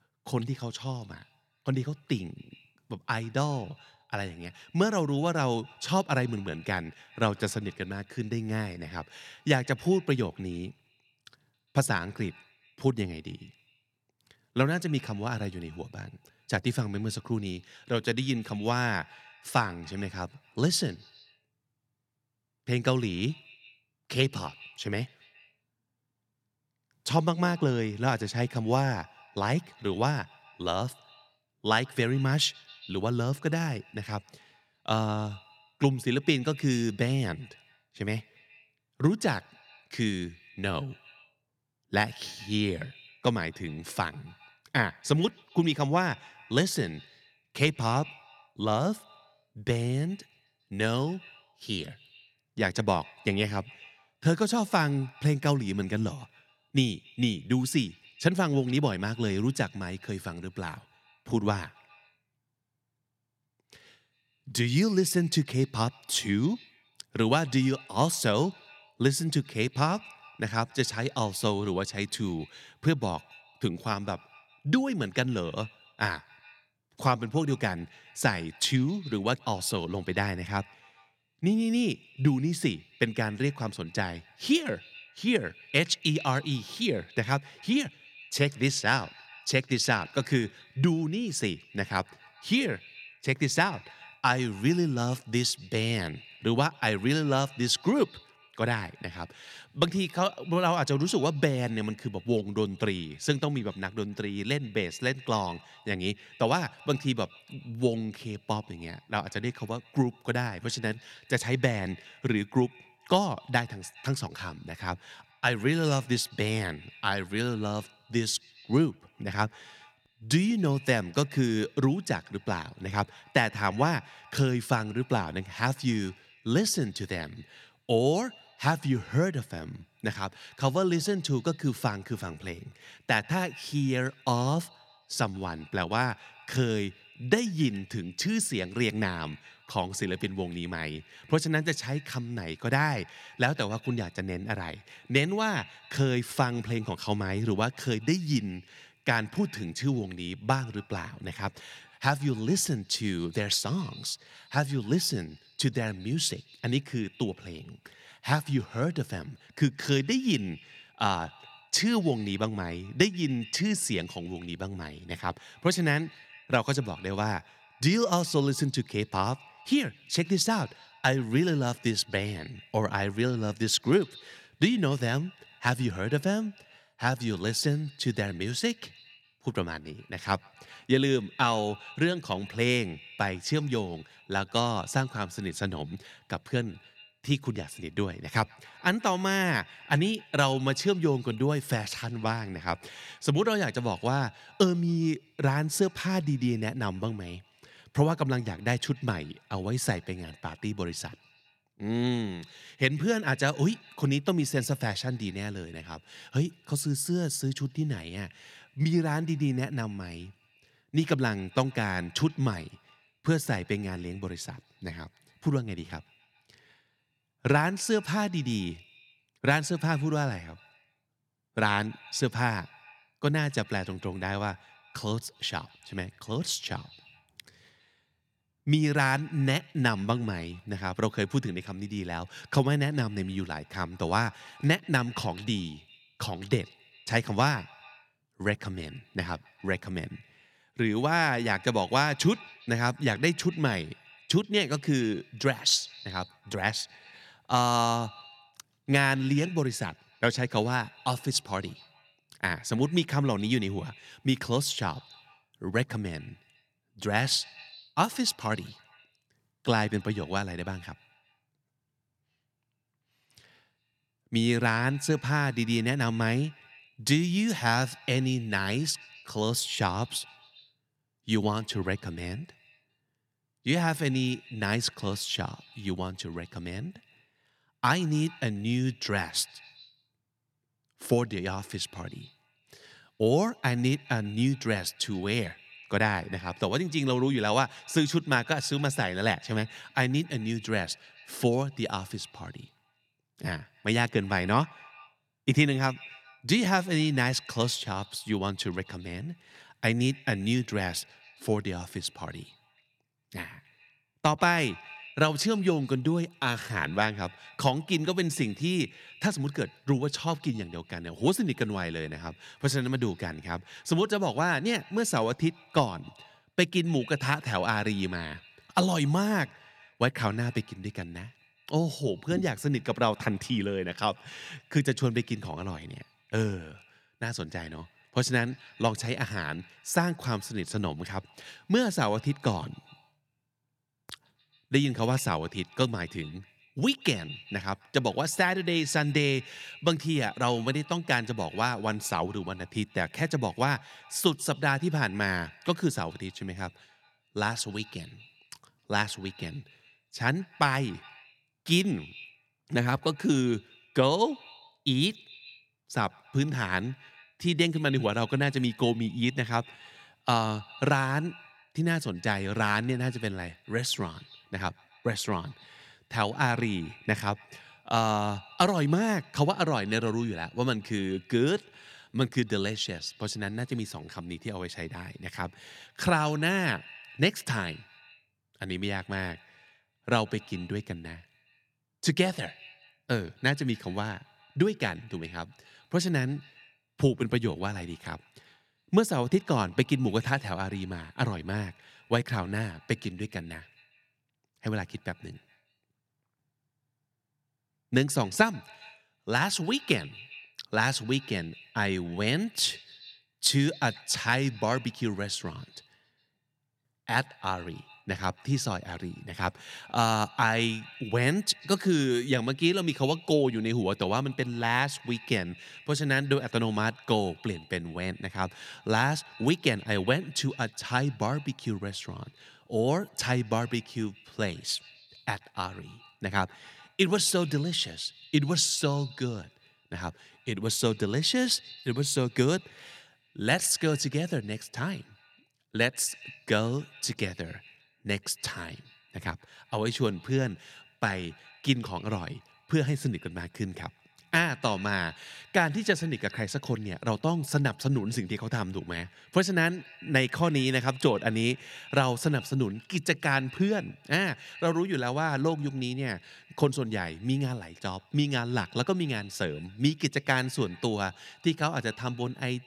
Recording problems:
echo of what is said; faint; throughout; 130 ms later, 25 dB below the speech

